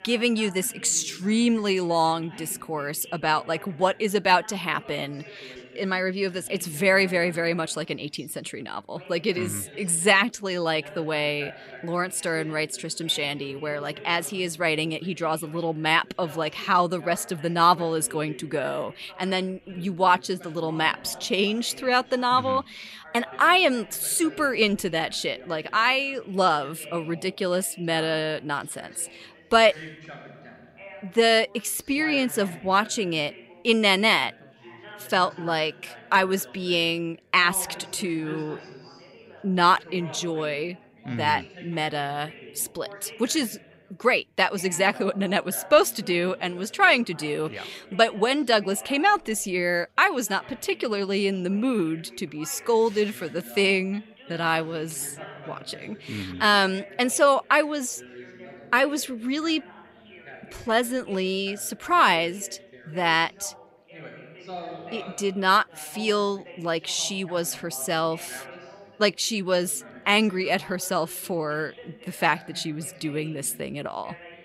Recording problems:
background chatter; noticeable; throughout; 3 voices, 20 dB below the speech

